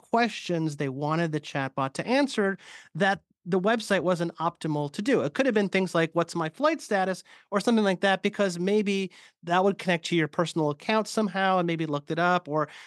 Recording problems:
none

